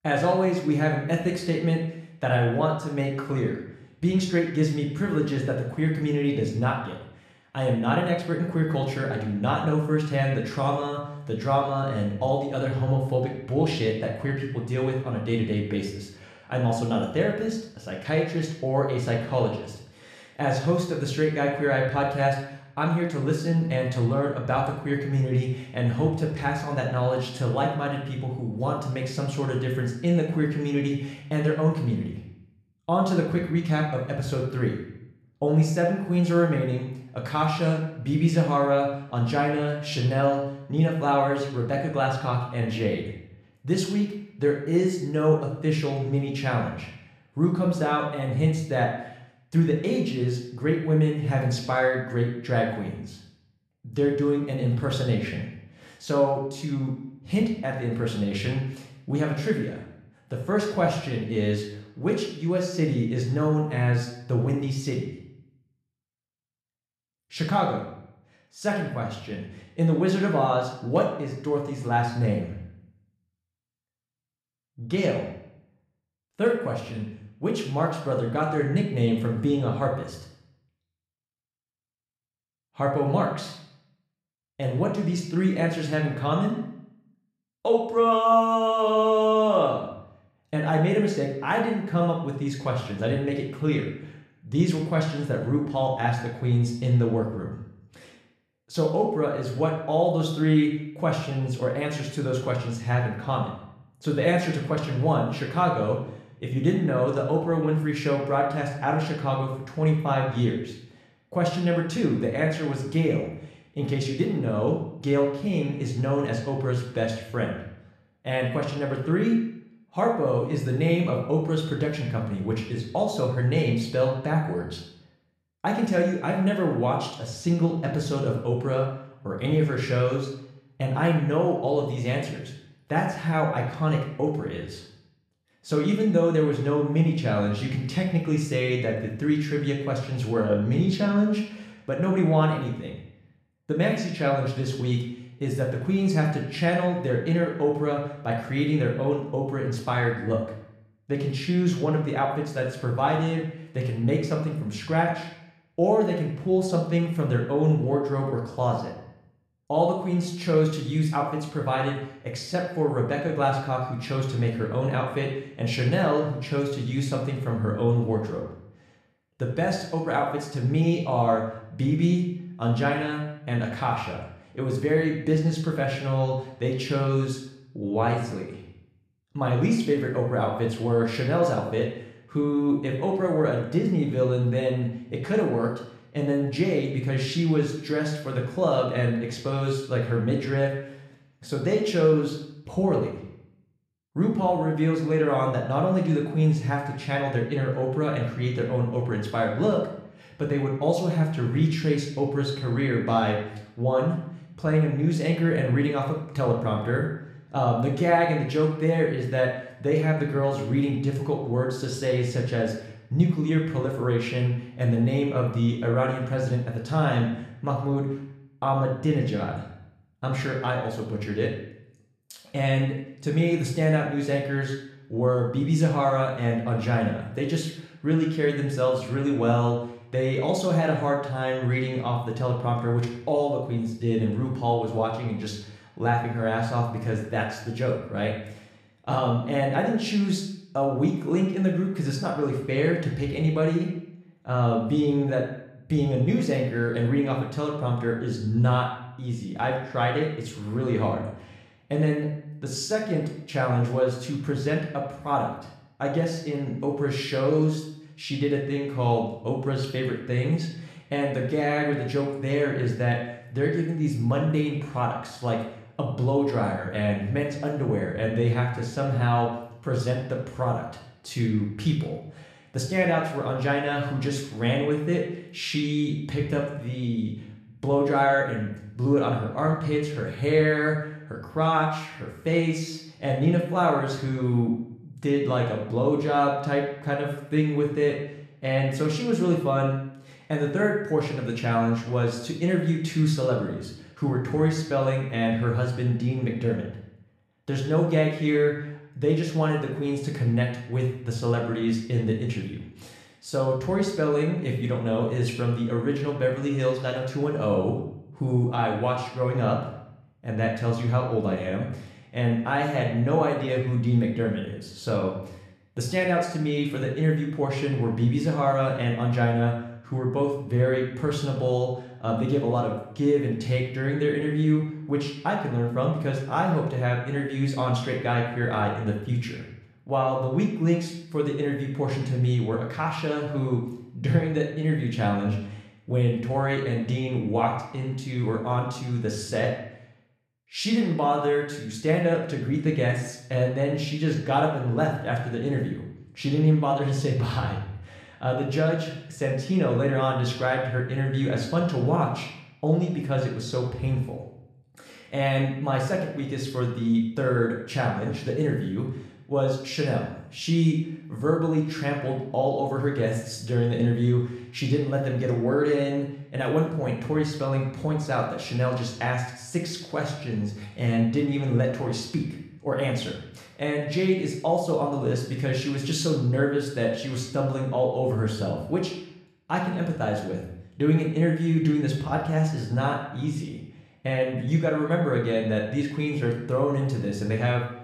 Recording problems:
room echo; noticeable; dies away in 0.7 s
off-mic speech; somewhat distant

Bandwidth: 13.5 kHz